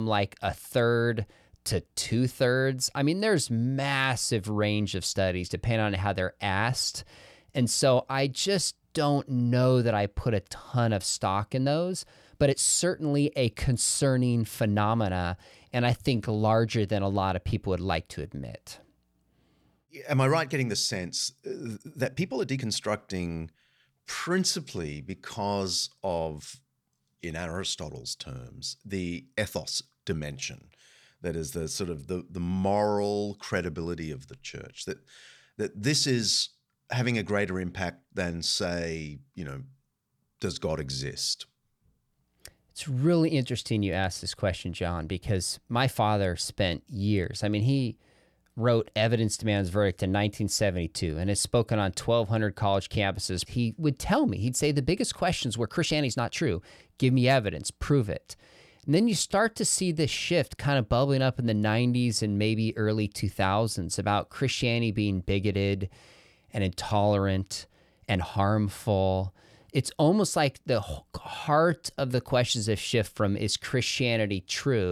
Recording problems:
abrupt cut into speech; at the start and the end
uneven, jittery; strongly; from 2 s to 1:12

